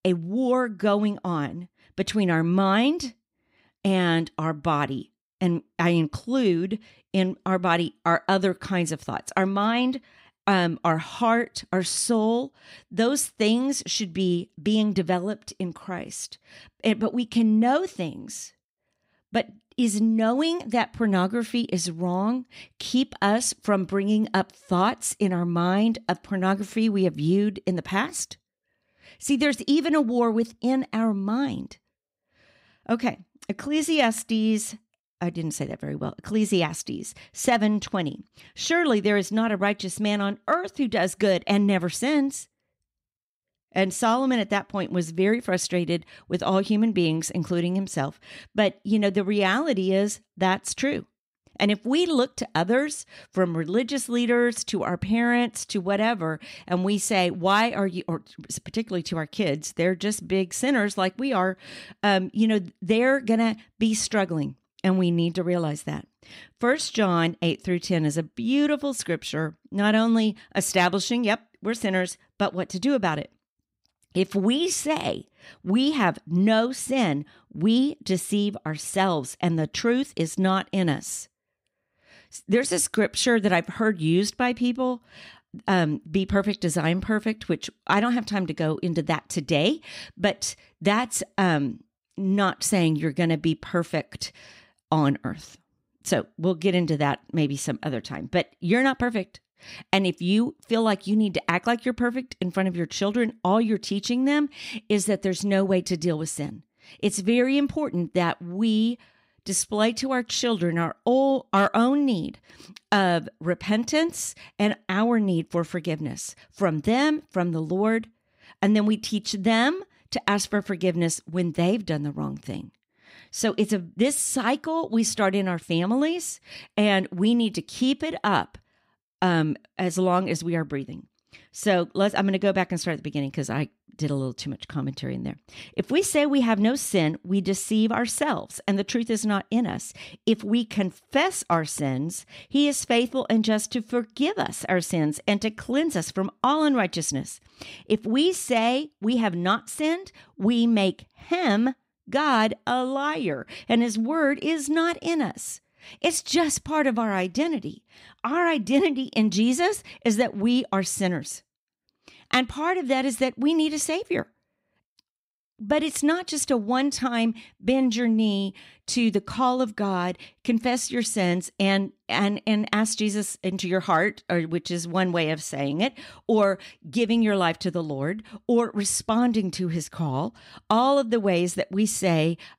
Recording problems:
none

